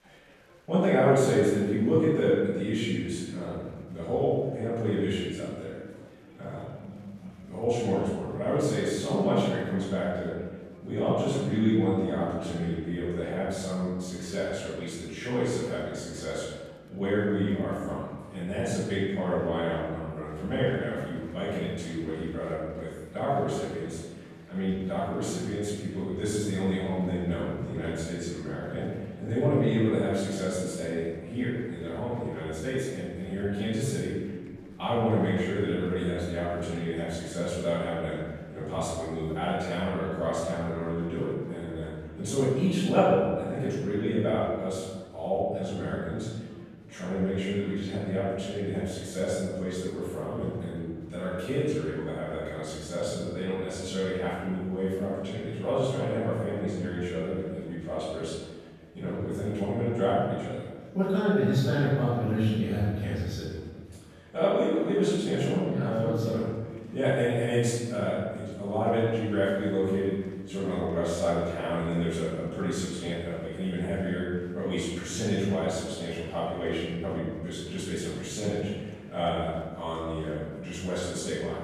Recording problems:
room echo; strong; dies away in 1.3 s
off-mic speech; far
chatter from many people; faint; throughout; 30 dB below the speech

